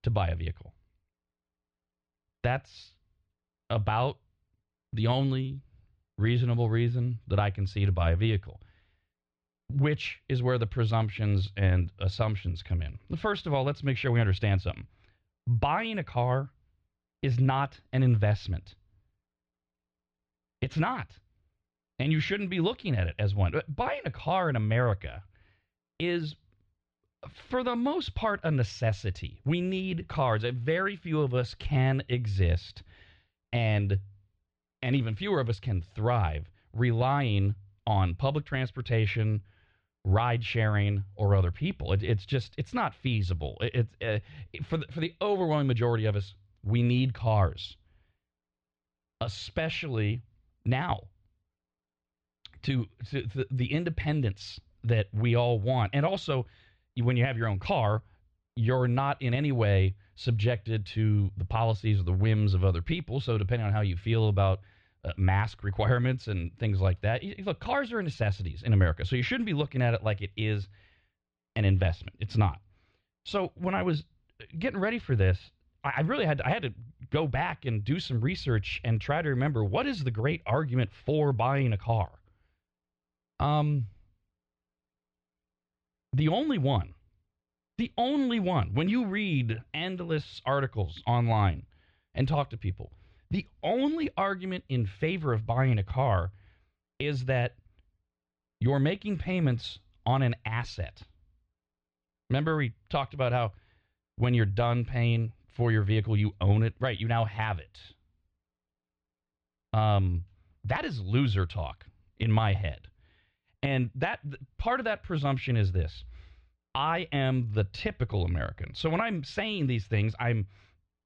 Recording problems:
muffled; slightly; fading above 4 kHz

